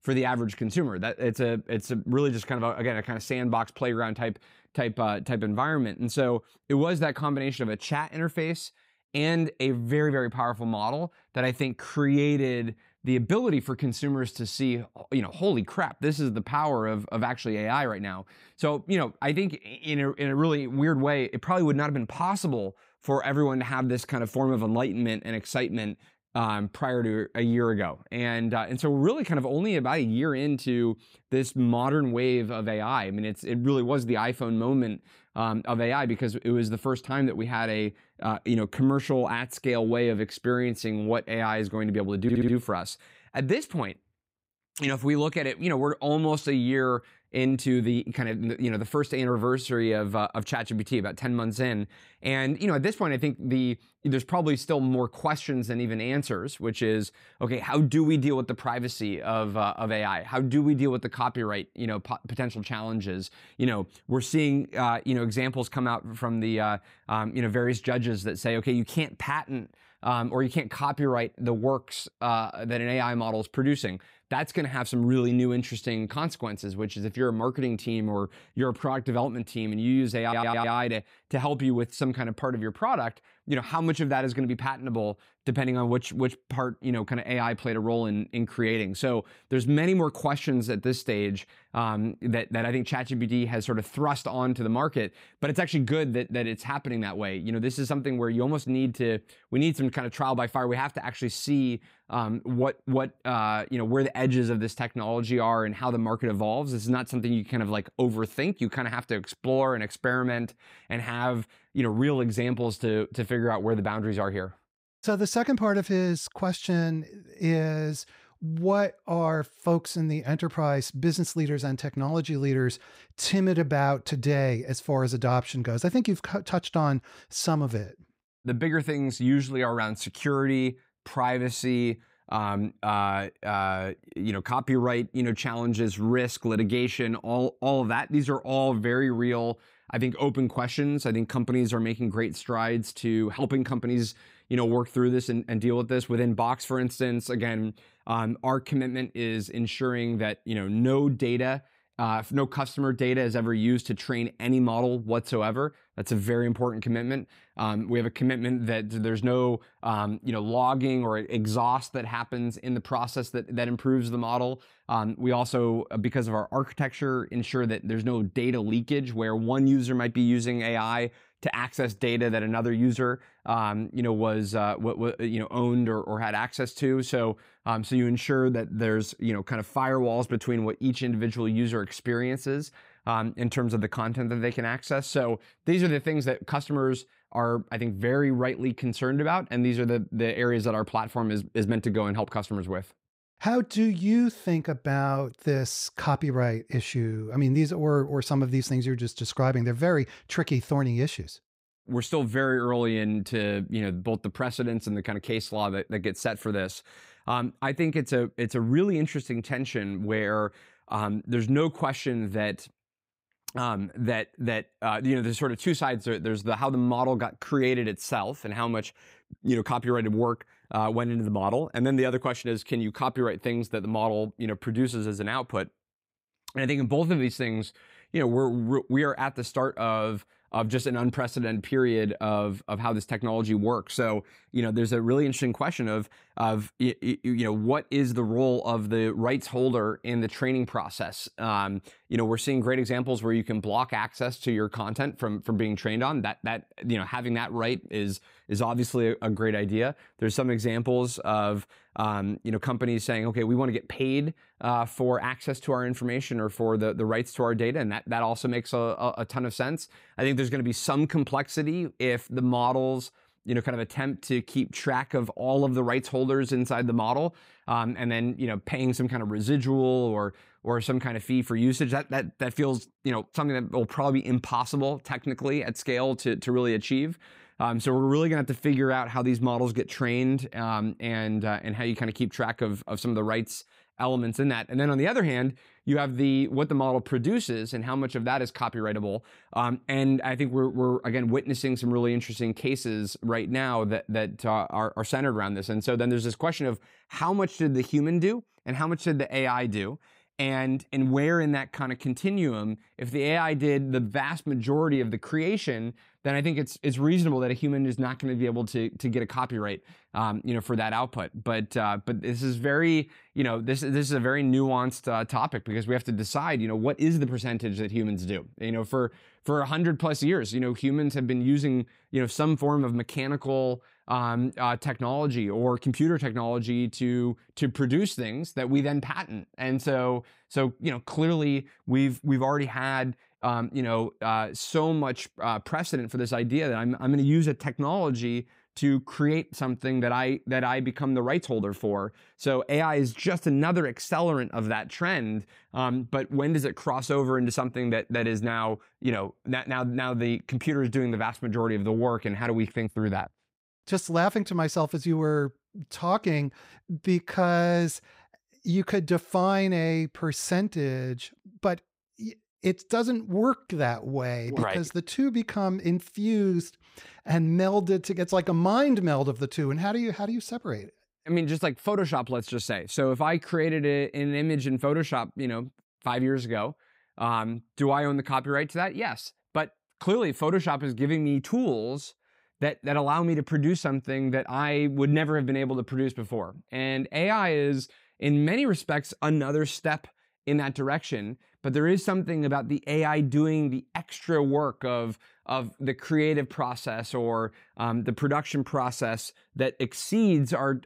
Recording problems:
audio stuttering; at 42 s and at 1:20

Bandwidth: 15.5 kHz